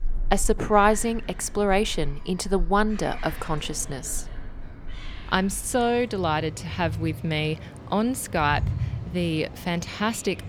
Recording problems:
animal sounds; noticeable; throughout; 10 dB below the speech

